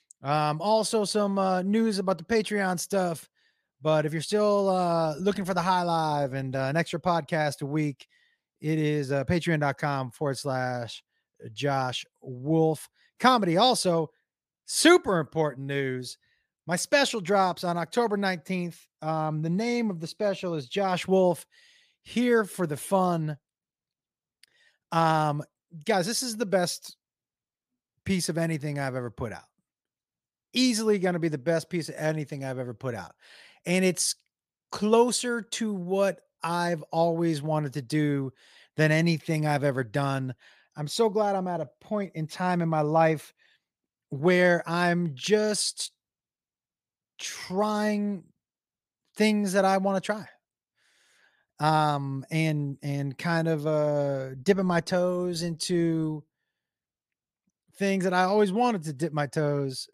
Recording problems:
none

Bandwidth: 15 kHz